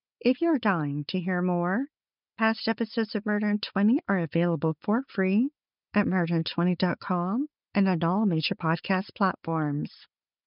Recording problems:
high frequencies cut off; noticeable; nothing above 5.5 kHz

